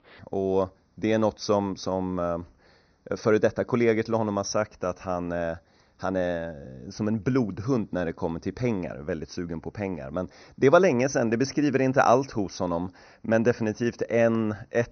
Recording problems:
high frequencies cut off; noticeable; nothing above 6 kHz

